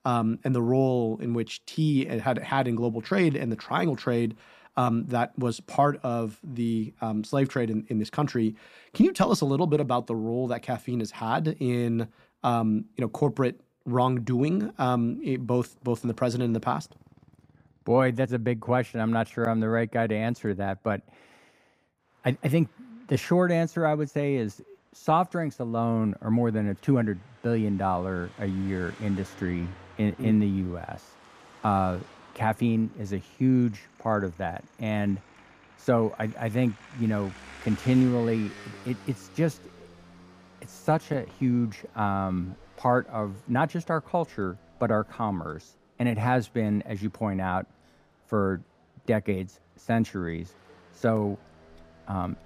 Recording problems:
traffic noise; faint; throughout; 25 dB below the speech

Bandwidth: 15 kHz